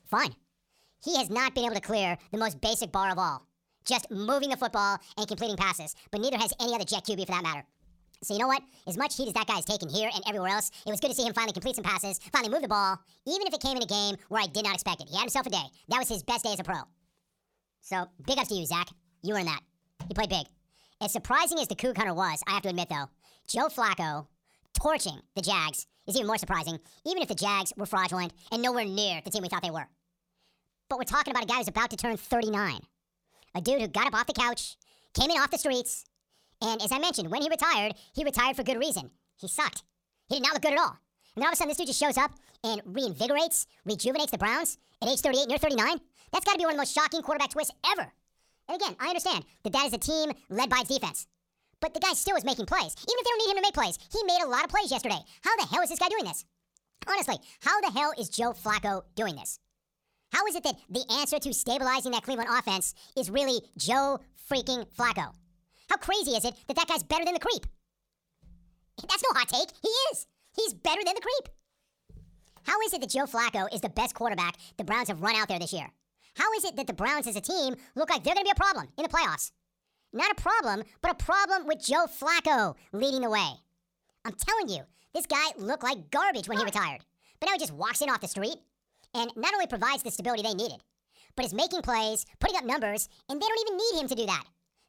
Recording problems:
wrong speed and pitch; too fast and too high; 1.6 times normal speed

